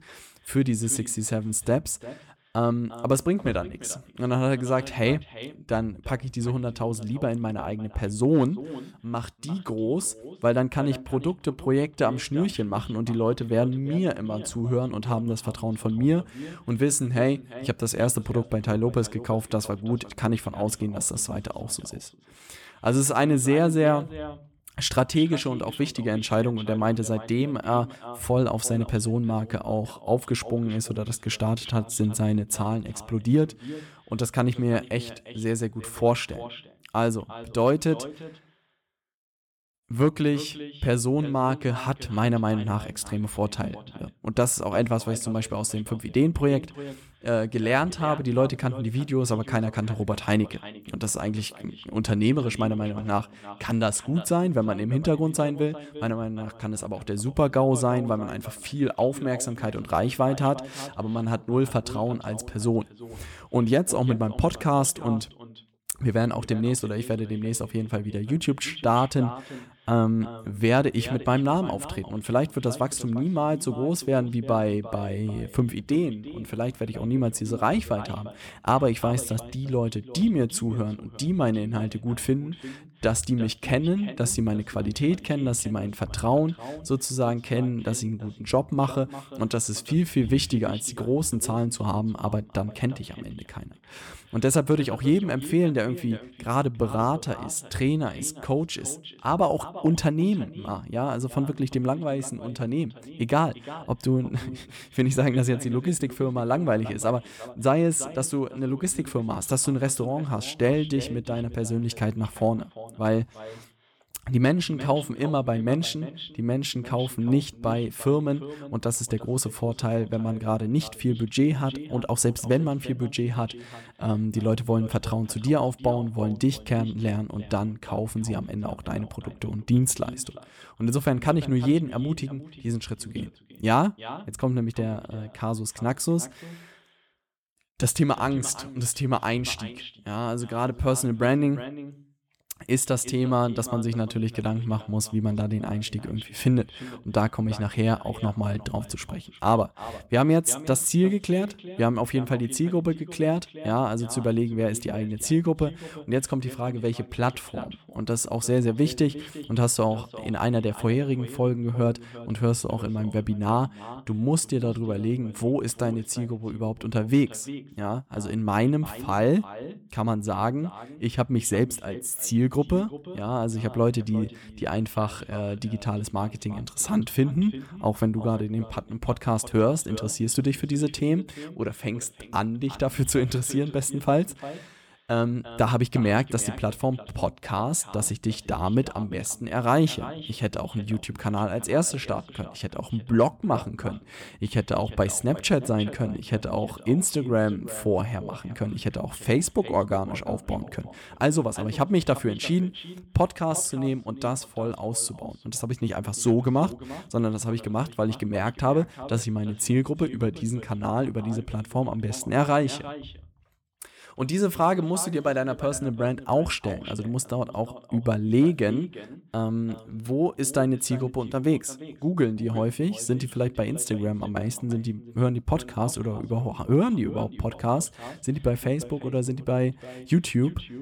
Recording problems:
echo of what is said; noticeable; throughout; 350 ms later, 15 dB below the speech

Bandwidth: 17.5 kHz